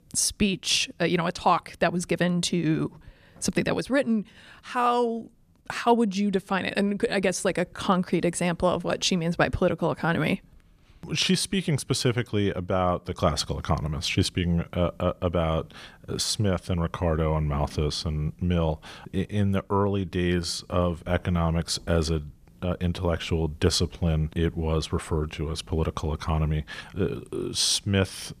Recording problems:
none

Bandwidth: 14.5 kHz